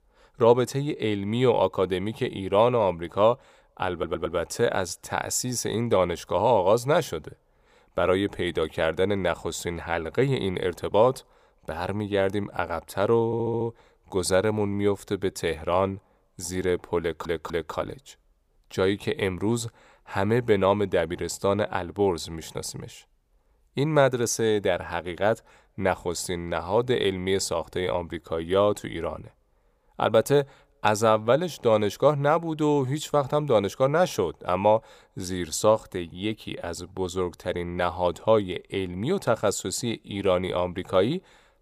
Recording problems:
audio stuttering; at 4 s, at 13 s and at 17 s

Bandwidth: 15 kHz